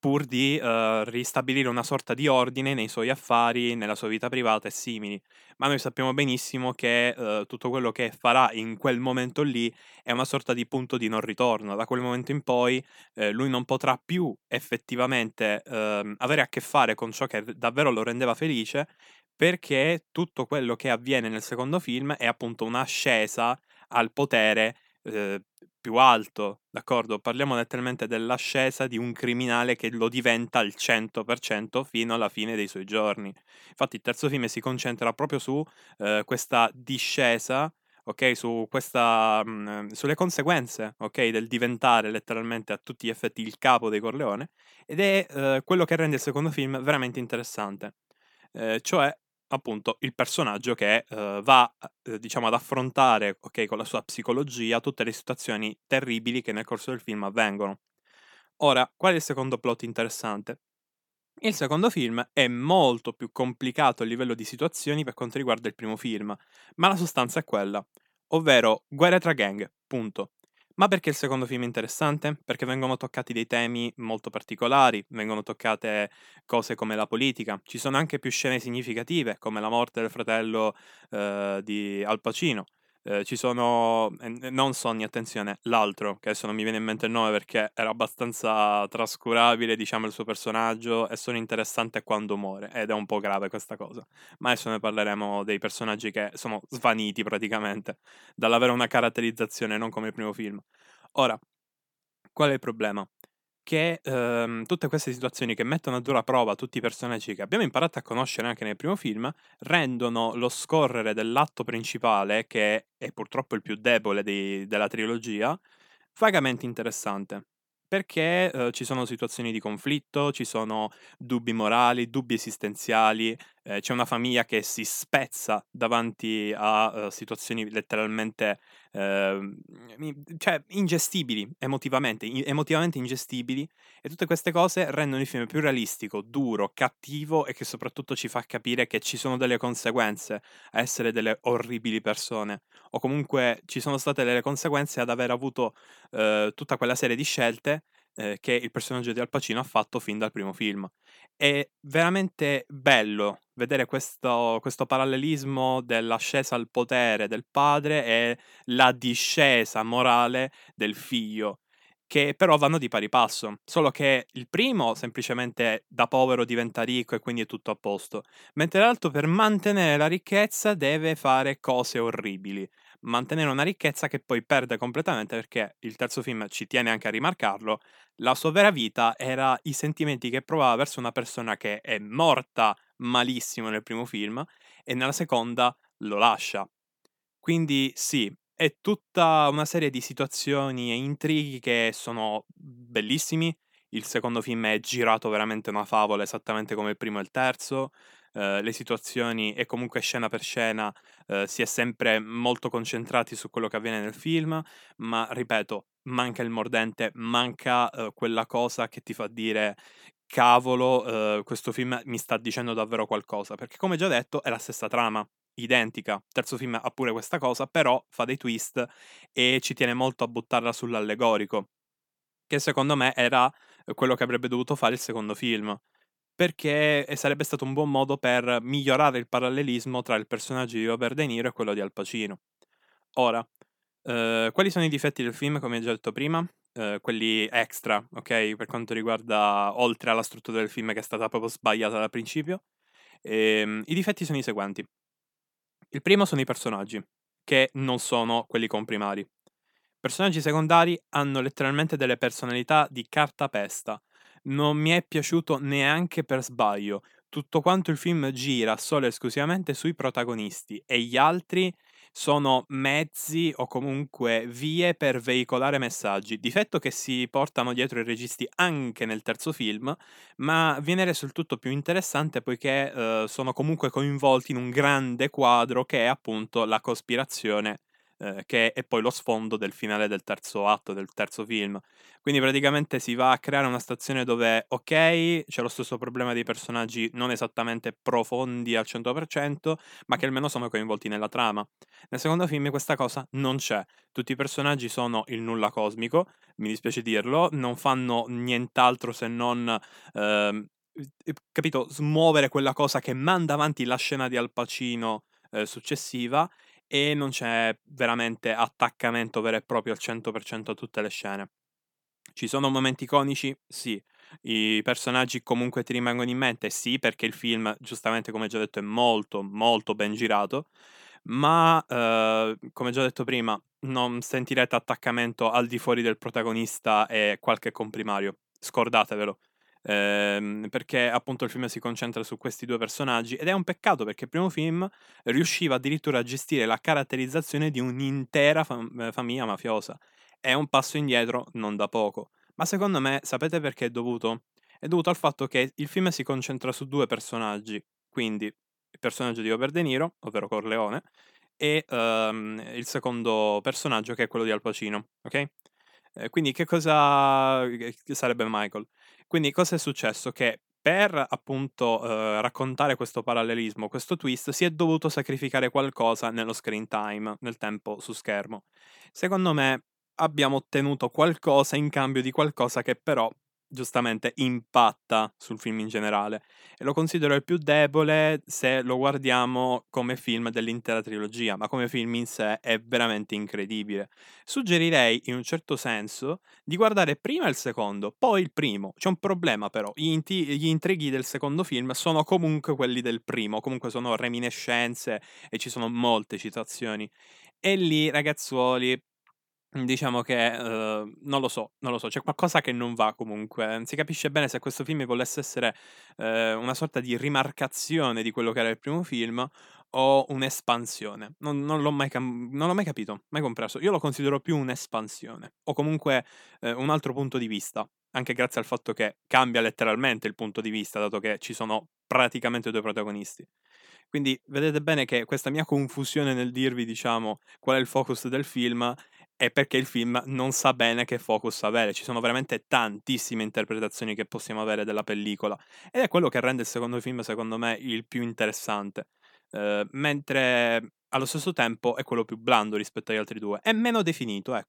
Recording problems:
none

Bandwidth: 18.5 kHz